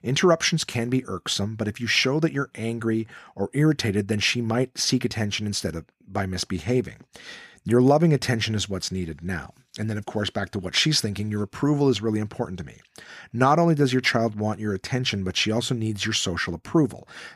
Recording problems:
none

